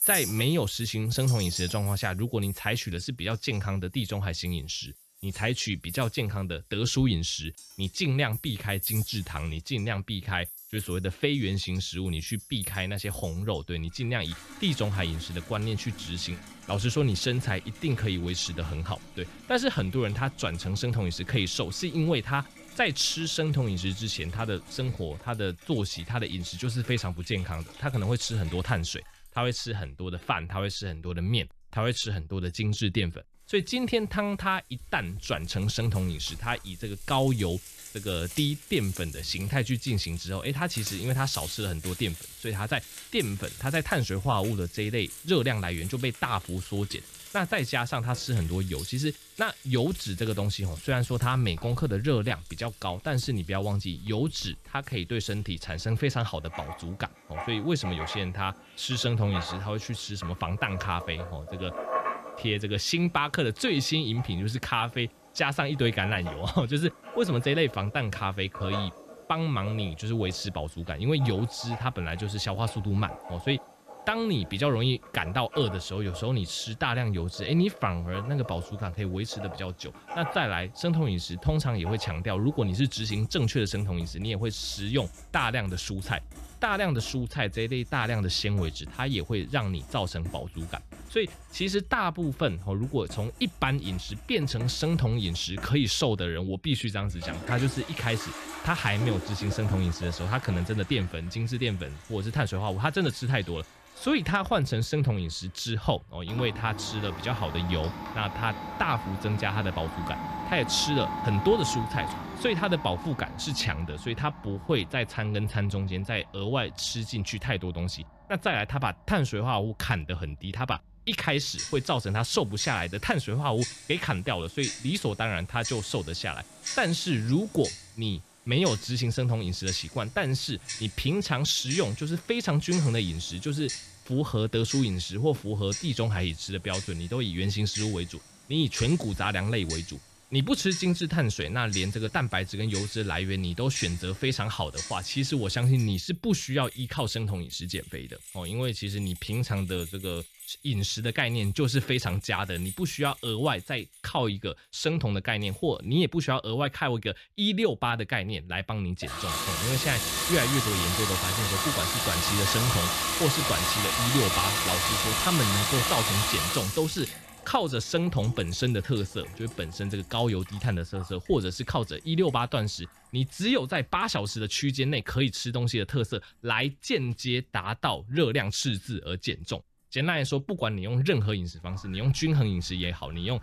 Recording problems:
household noises; loud; throughout; 6 dB below the speech

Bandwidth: 14 kHz